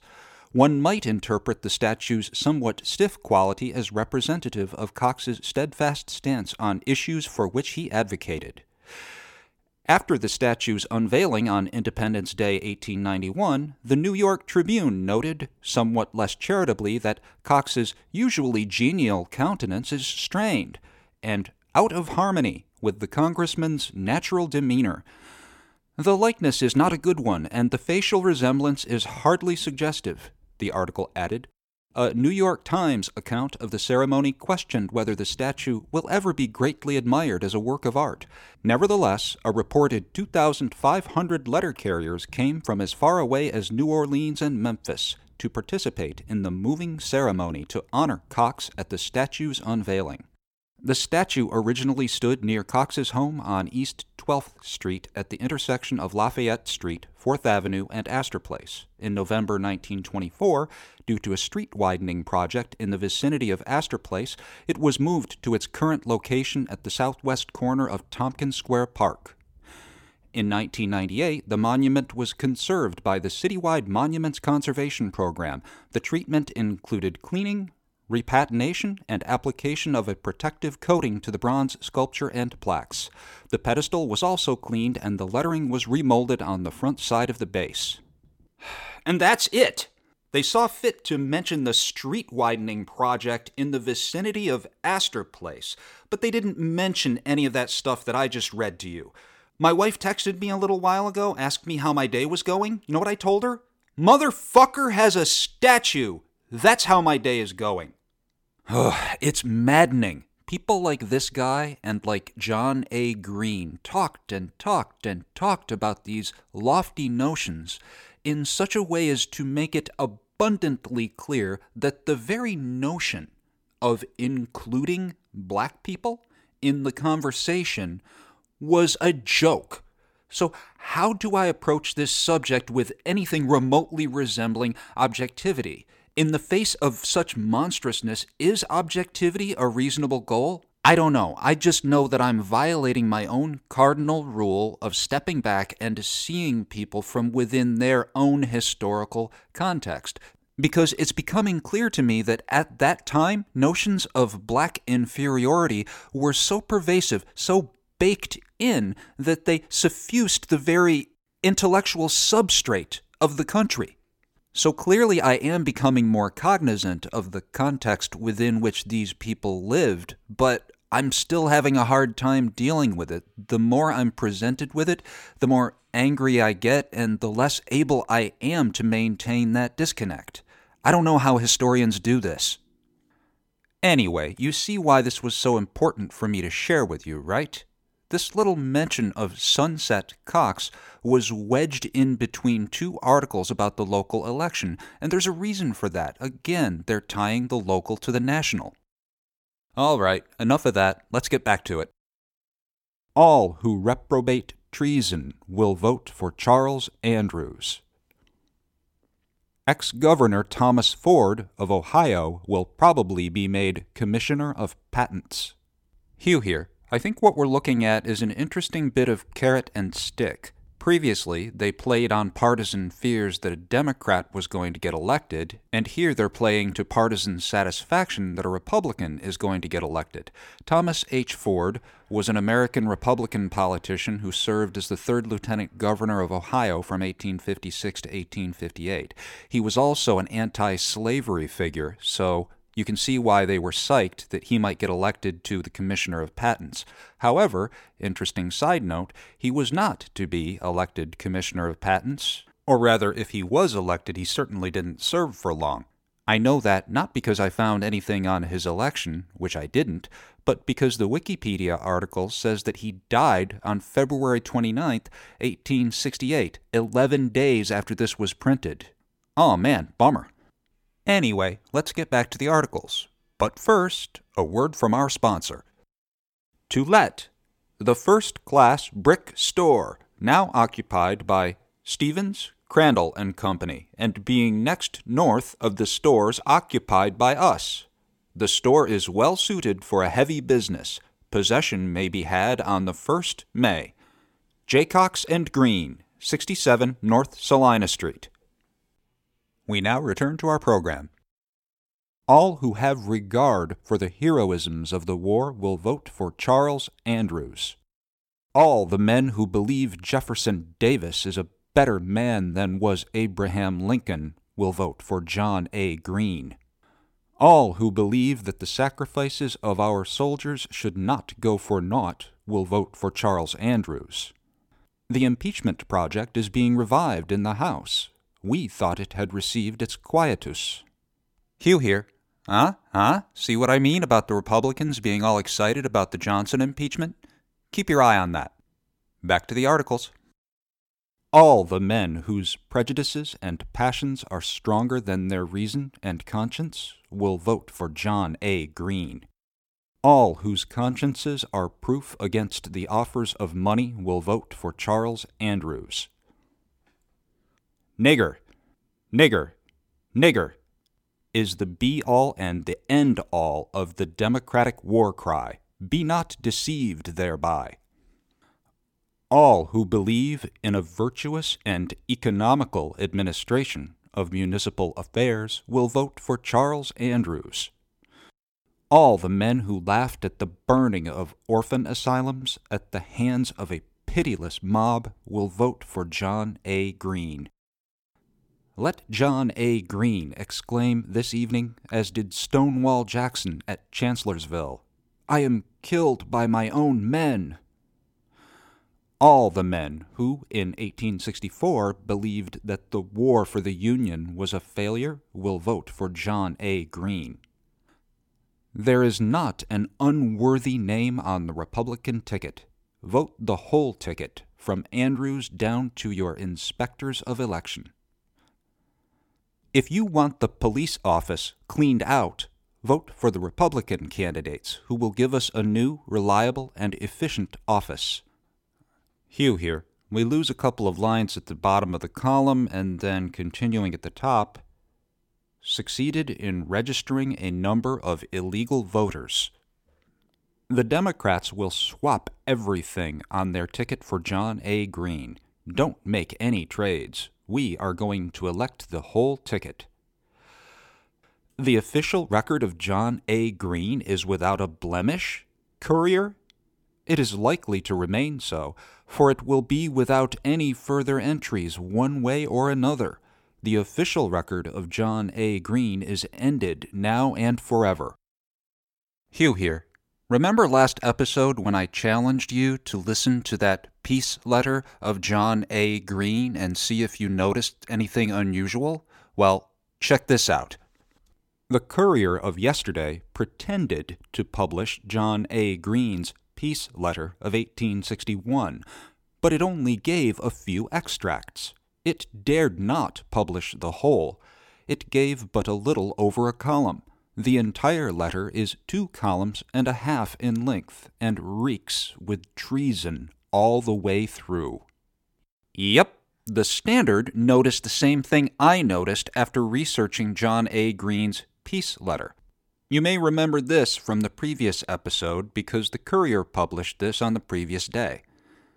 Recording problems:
none

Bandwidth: 17.5 kHz